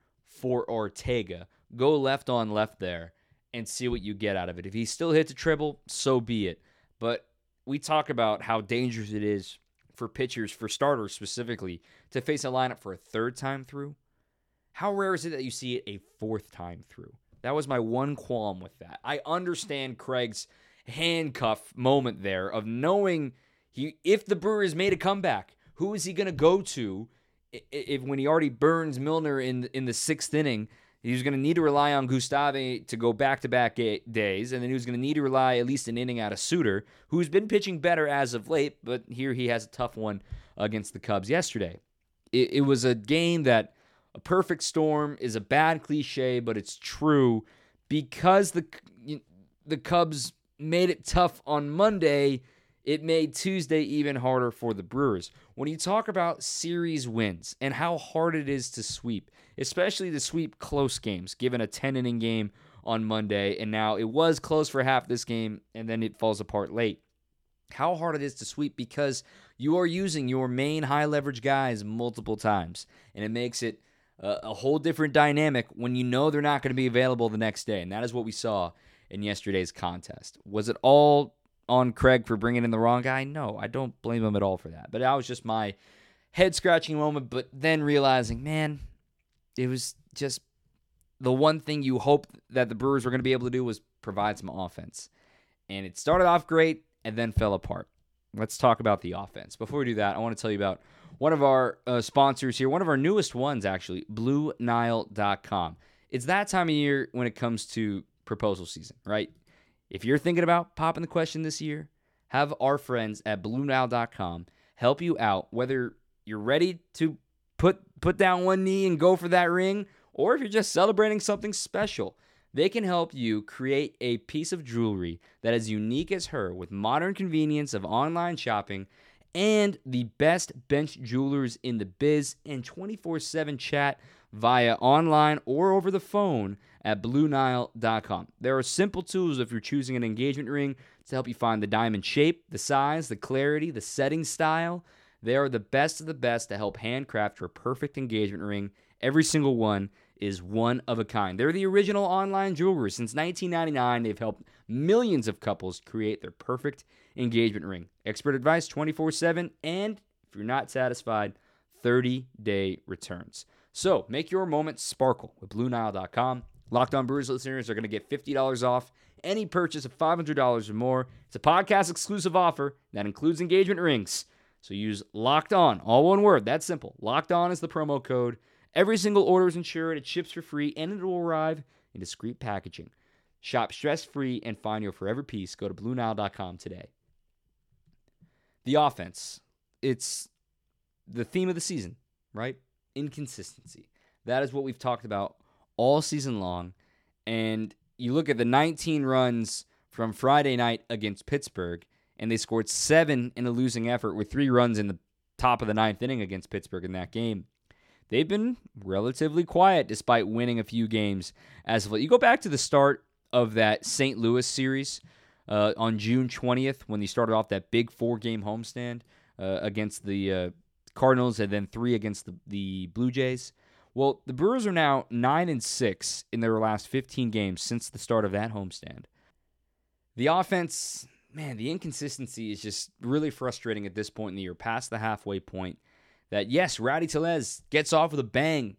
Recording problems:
none

